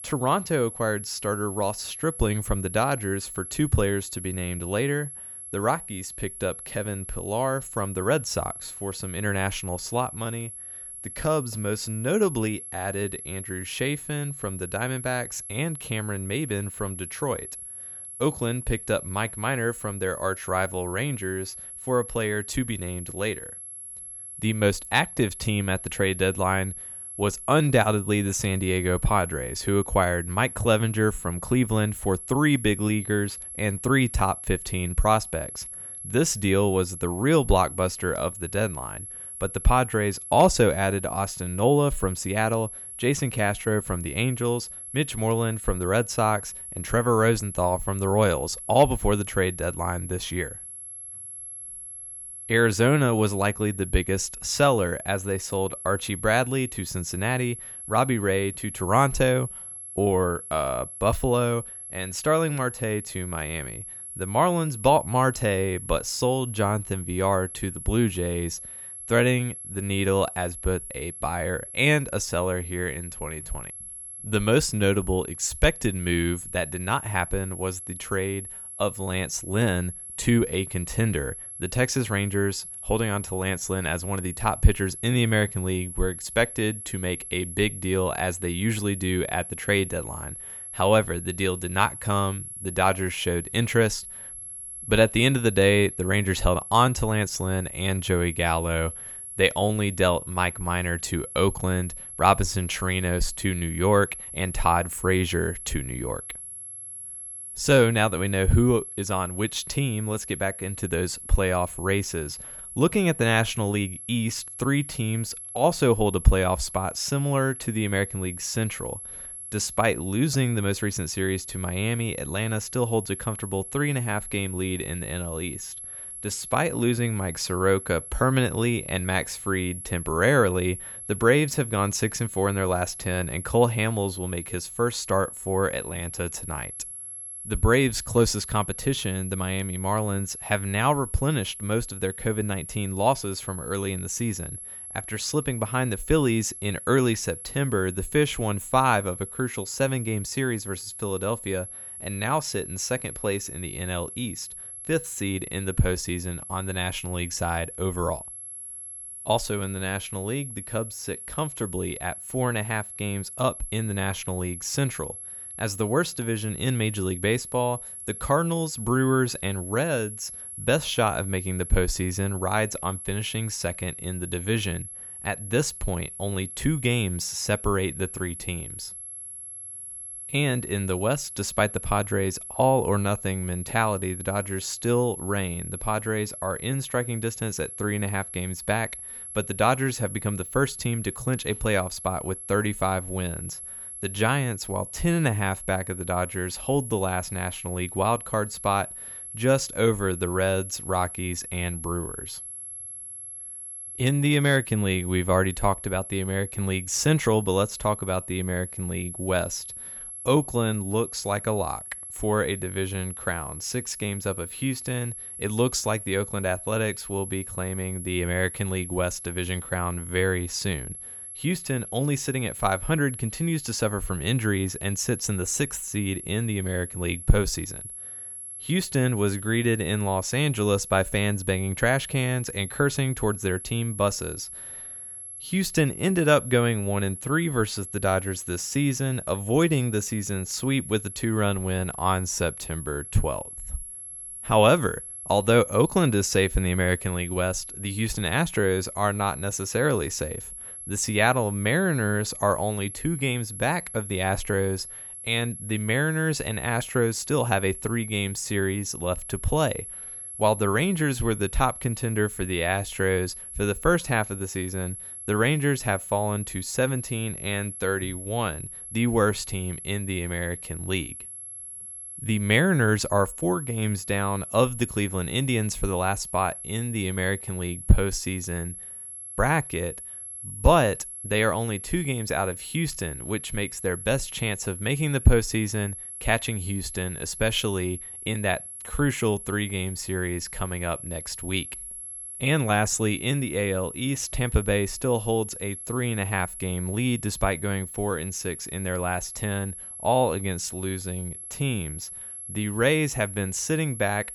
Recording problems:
high-pitched whine; loud; throughout; 11 kHz, 10 dB below the speech

